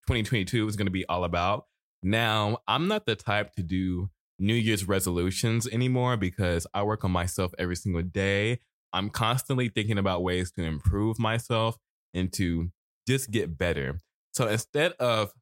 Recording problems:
none

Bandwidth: 16 kHz